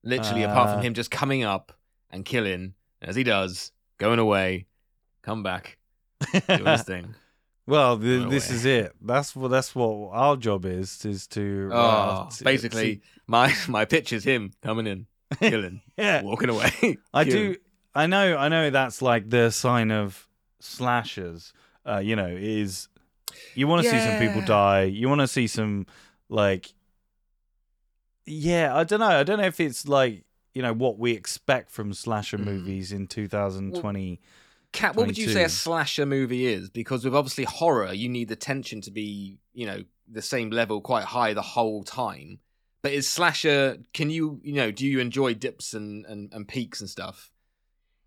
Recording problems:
none

